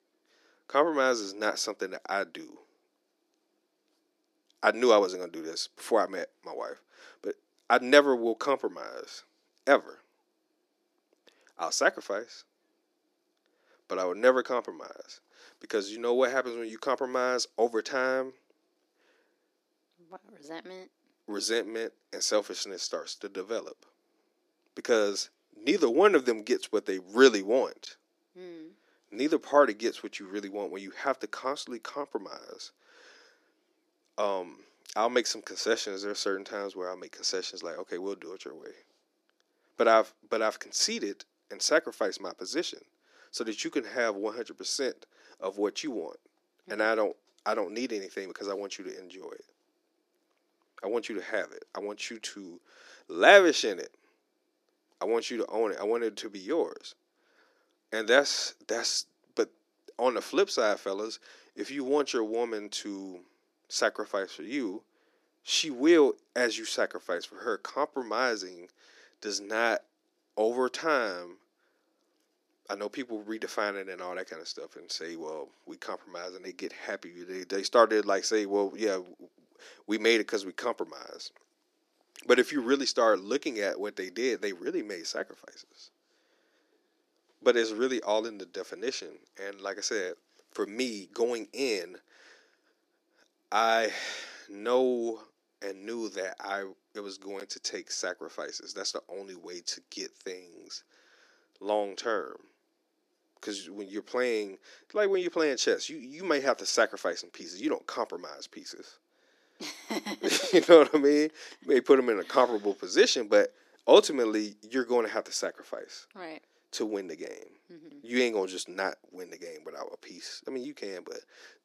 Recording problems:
thin; somewhat; fading below 300 Hz

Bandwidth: 14.5 kHz